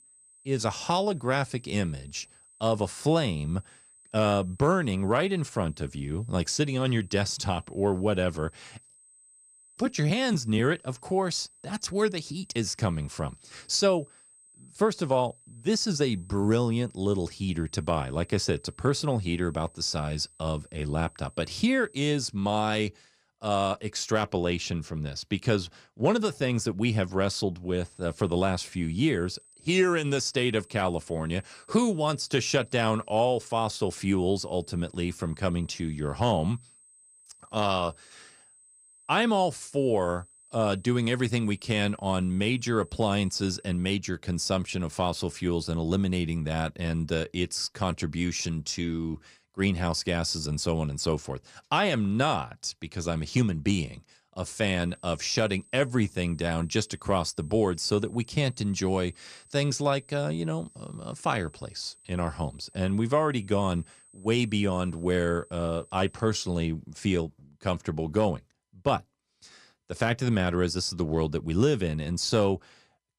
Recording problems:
high-pitched whine; faint; until 22 s, from 28 to 44 s and from 55 s to 1:07; 8 kHz, 25 dB below the speech

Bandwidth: 15 kHz